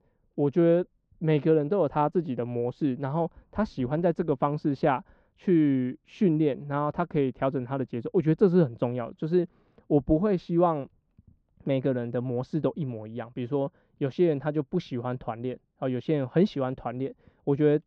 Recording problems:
muffled; very; fading above 1 kHz

